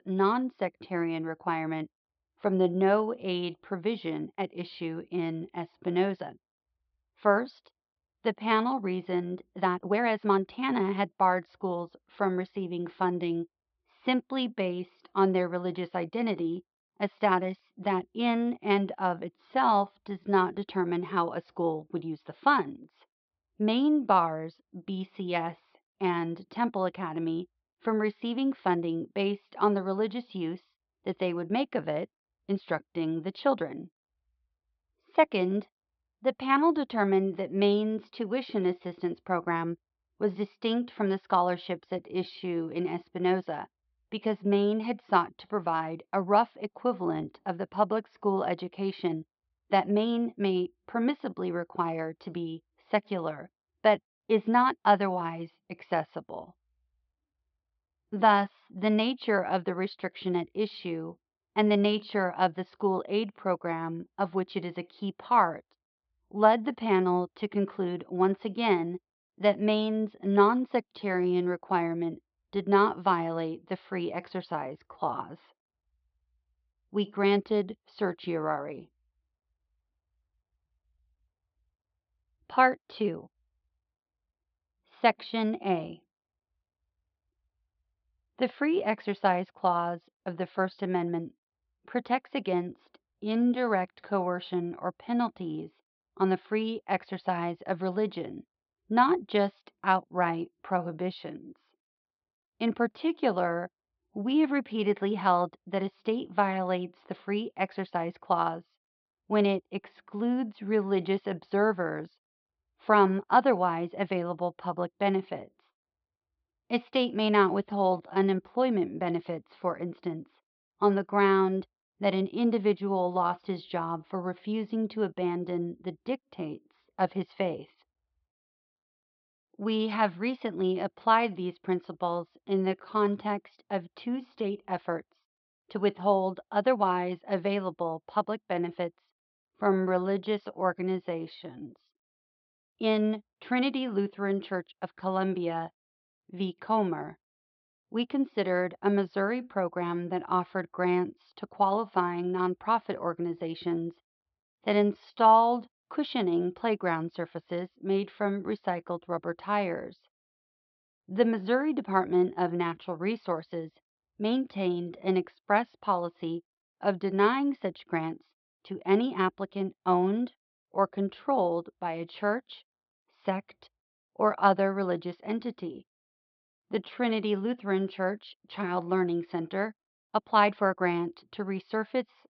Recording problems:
muffled; slightly; fading above 4 kHz
high frequencies cut off; noticeable; nothing above 5.5 kHz
uneven, jittery; strongly; from 9.5 s to 3:01

